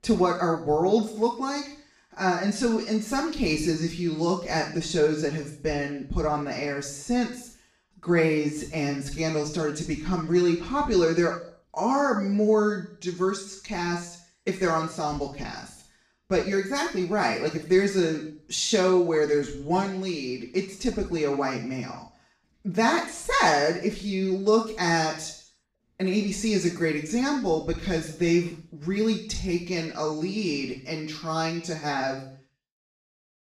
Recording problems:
off-mic speech; far
room echo; noticeable; dies away in 0.5 s

